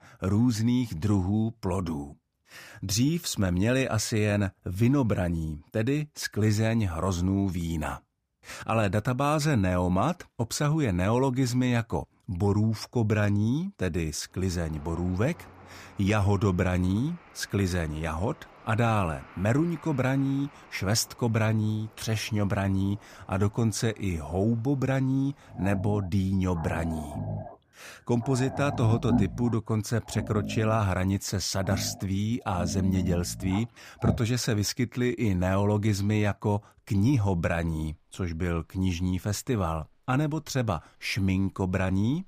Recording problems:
animal sounds; loud; from 15 s on; 9 dB below the speech

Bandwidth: 15 kHz